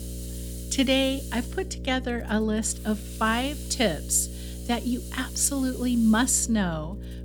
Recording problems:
electrical hum; noticeable; throughout; 60 Hz, 20 dB below the speech
hiss; noticeable; throughout; 15 dB below the speech

